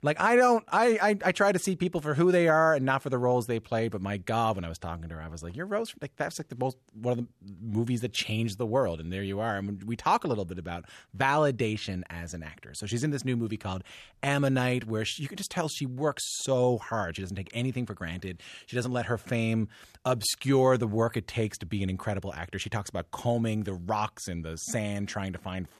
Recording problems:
none

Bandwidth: 13.5 kHz